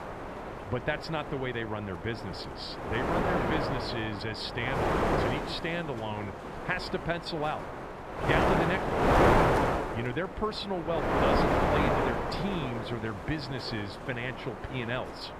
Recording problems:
wind noise on the microphone; heavy; 5 dB above the speech

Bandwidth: 14.5 kHz